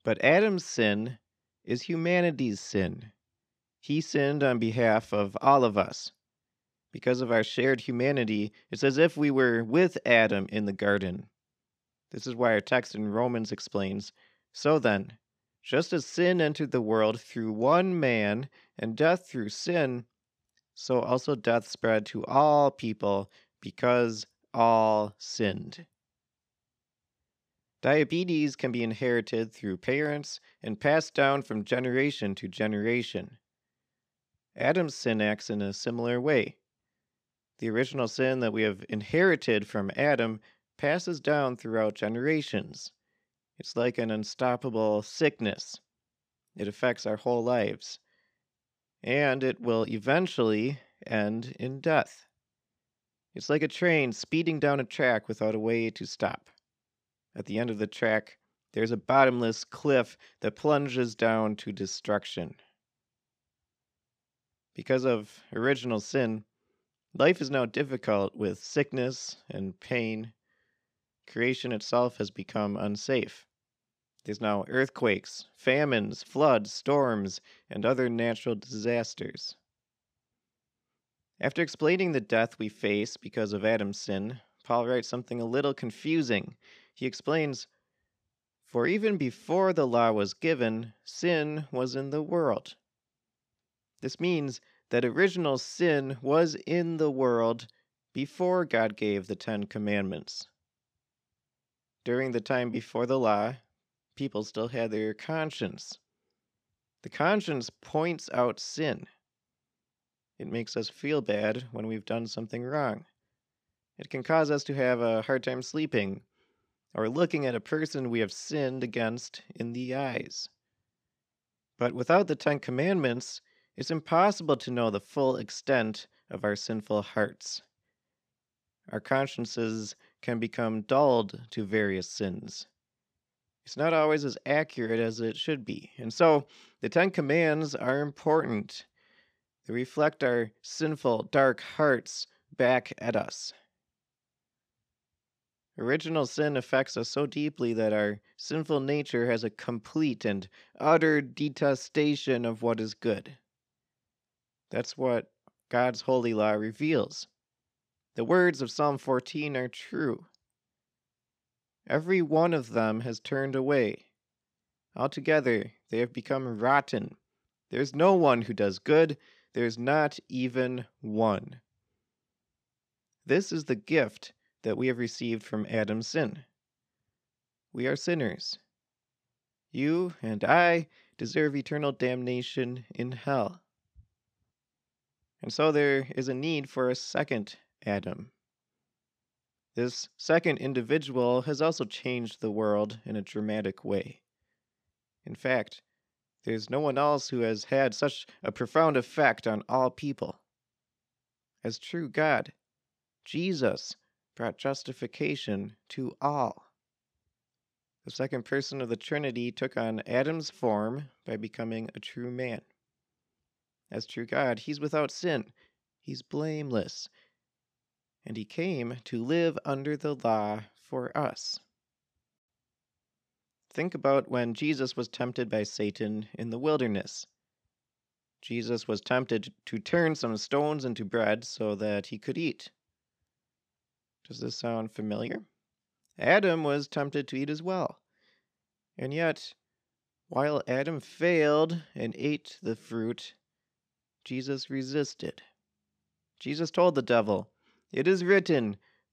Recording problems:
none

